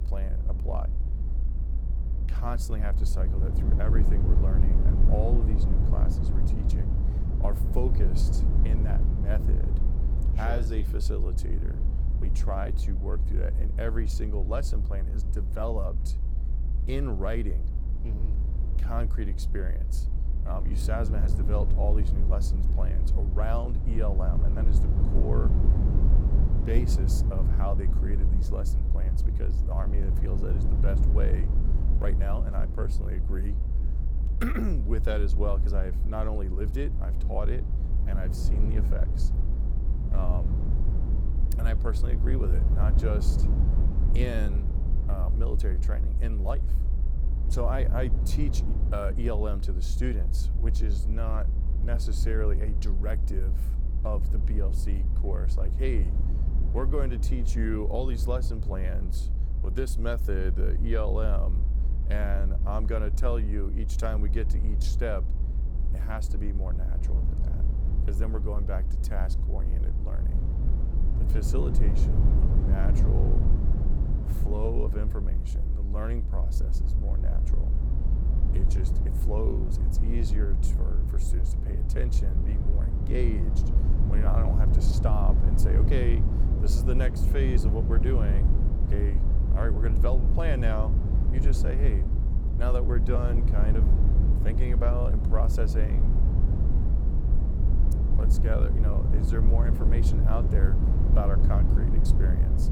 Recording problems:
low rumble; loud; throughout; 5 dB below the speech

